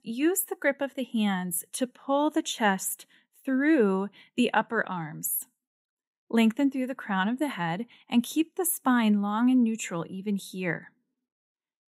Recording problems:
none

